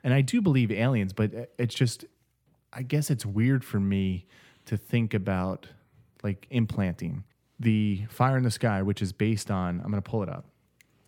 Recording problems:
none

